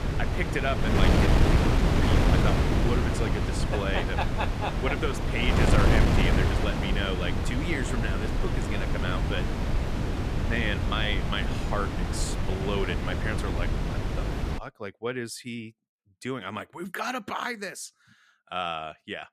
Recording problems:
wind noise on the microphone; heavy; until 15 s; as loud as the speech

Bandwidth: 14.5 kHz